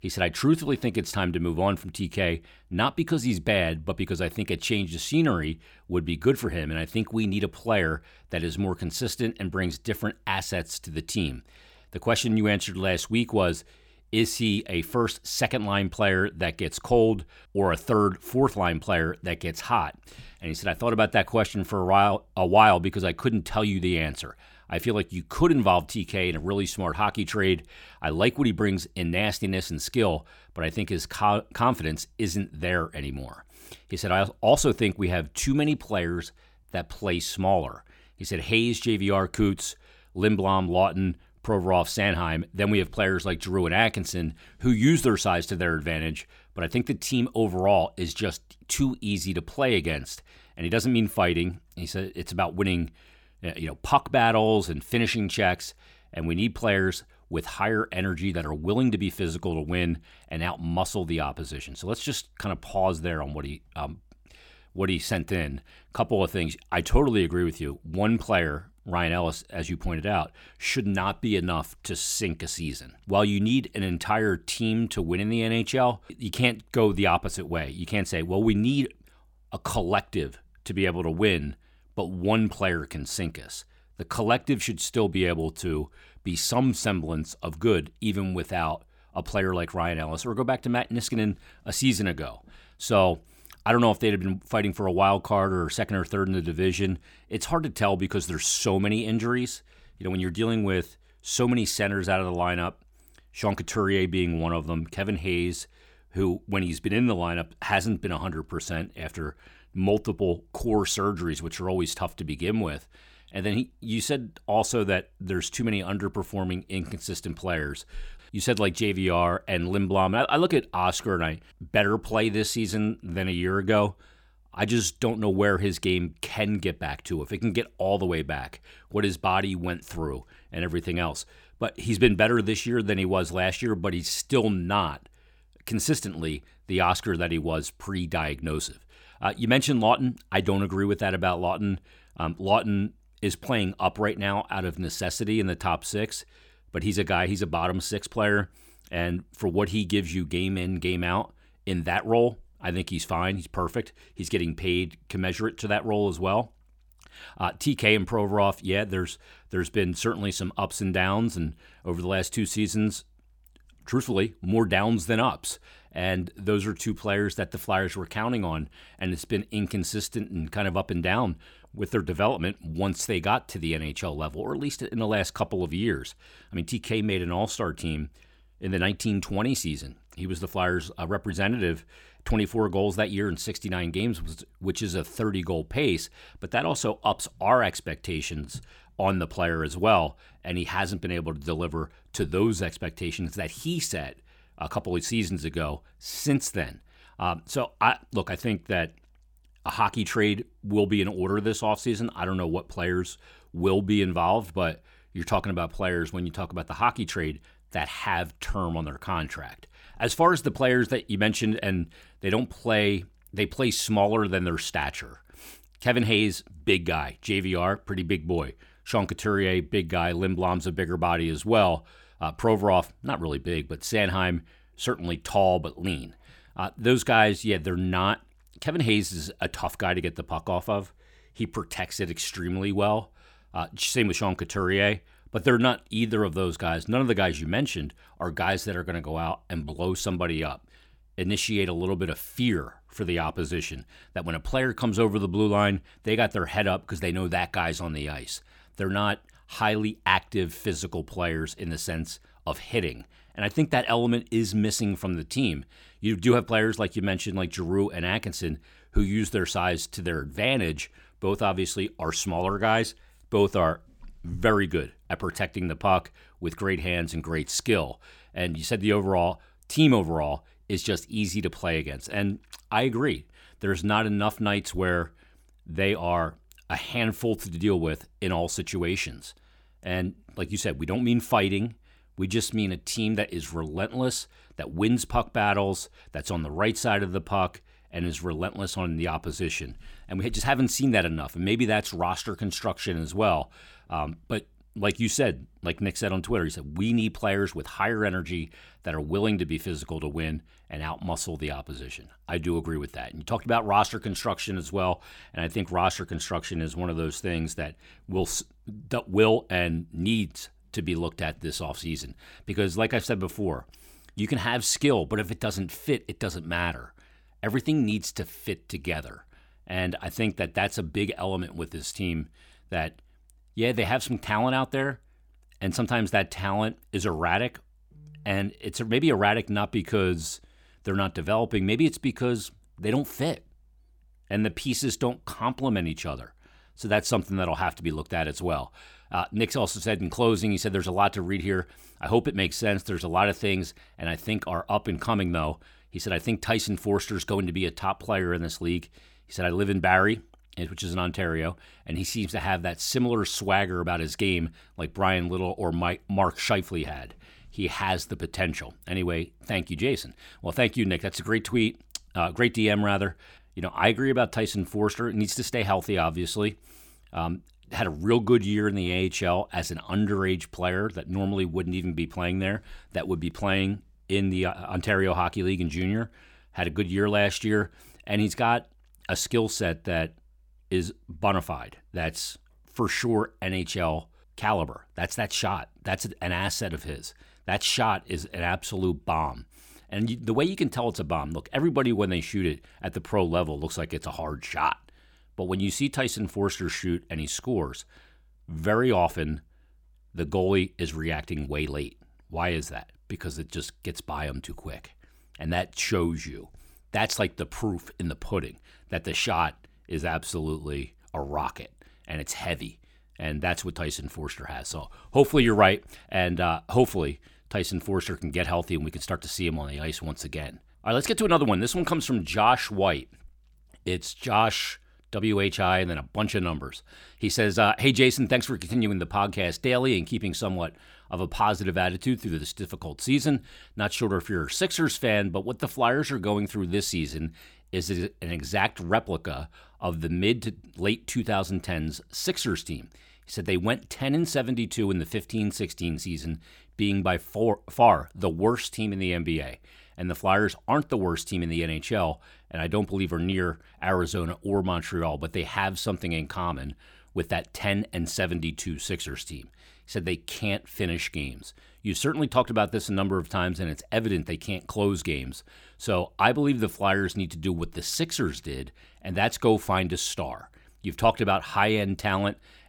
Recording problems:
none

